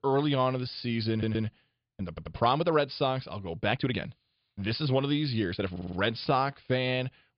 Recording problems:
high frequencies cut off; severe; nothing above 5 kHz
uneven, jittery; strongly; from 0.5 to 6.5 s
audio stuttering; at 1 s, at 2 s and at 5.5 s

